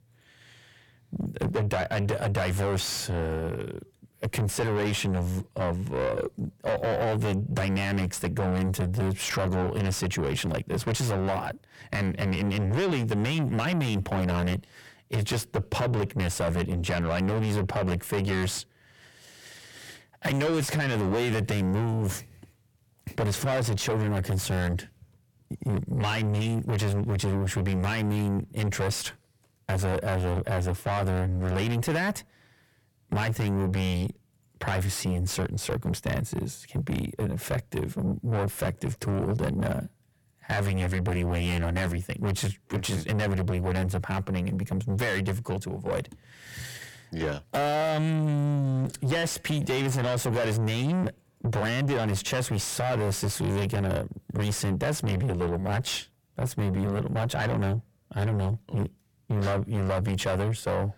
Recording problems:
distortion; heavy; 6 dB below the speech

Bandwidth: 18 kHz